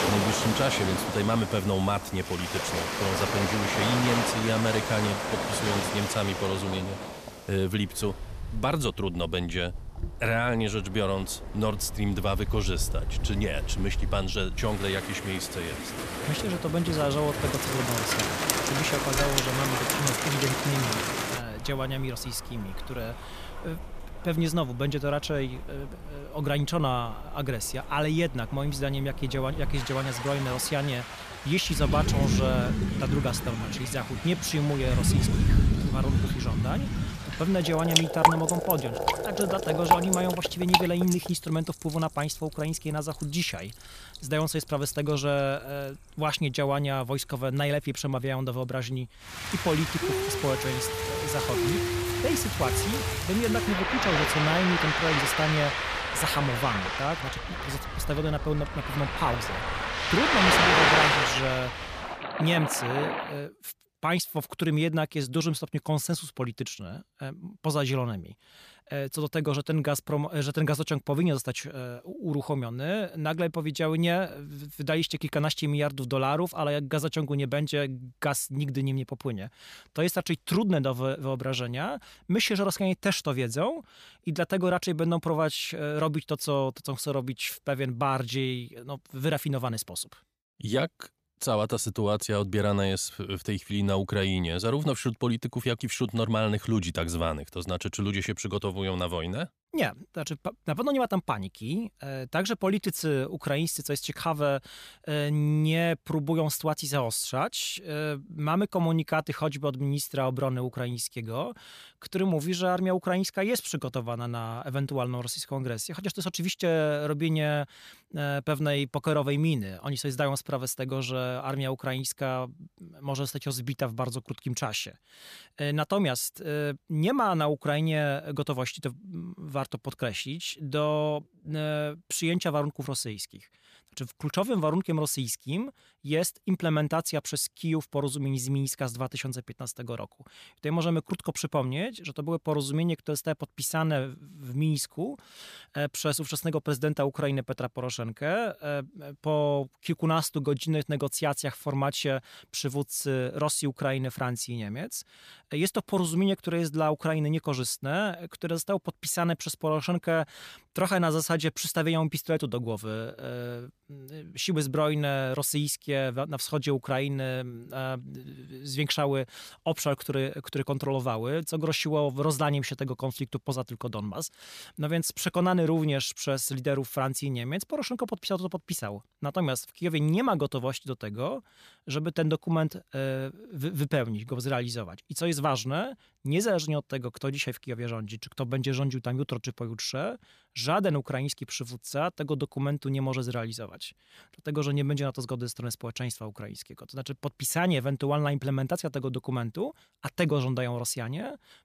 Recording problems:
rain or running water; very loud; until 1:03; 1 dB above the speech

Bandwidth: 14.5 kHz